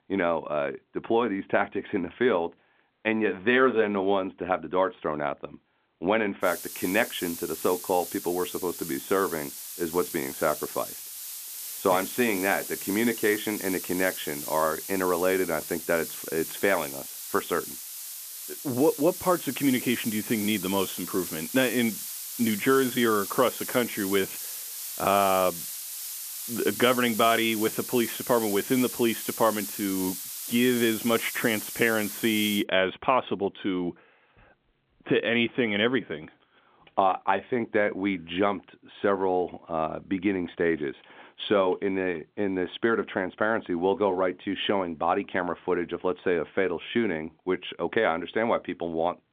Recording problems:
phone-call audio; nothing above 3.5 kHz
muffled; very slightly; fading above 3 kHz
hiss; loud; from 6.5 to 33 s; 7 dB below the speech

